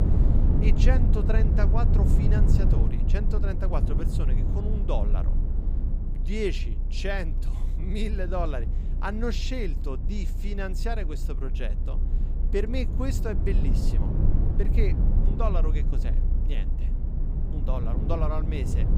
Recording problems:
low rumble; loud; throughout; 6 dB below the speech

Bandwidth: 15.5 kHz